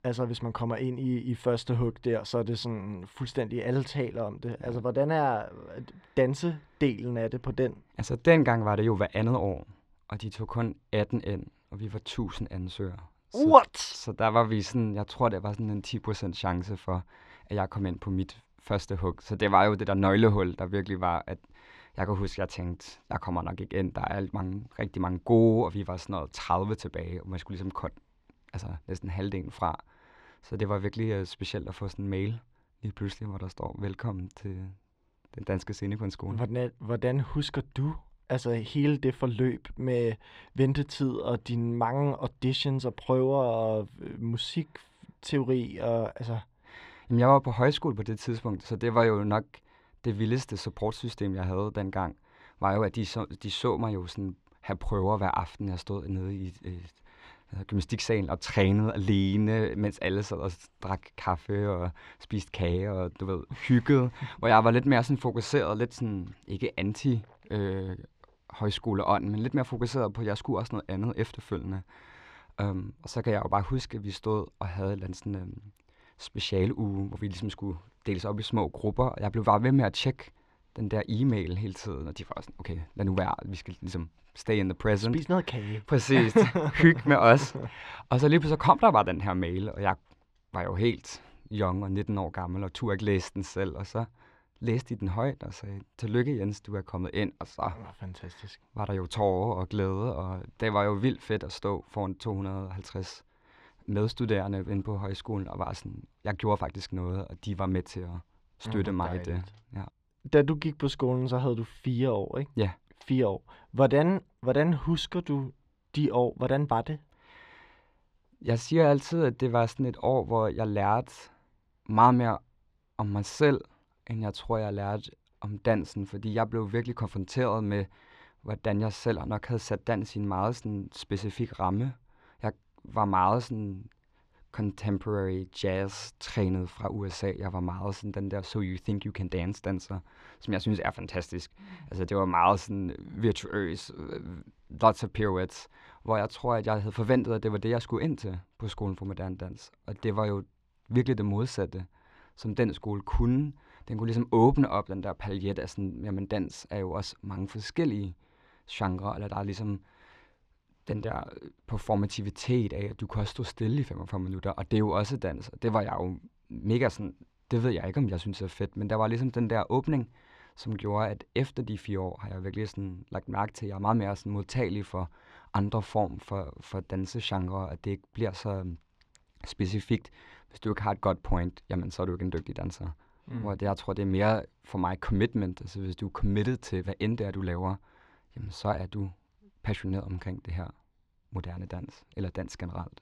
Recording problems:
muffled; very slightly; fading above 3.5 kHz

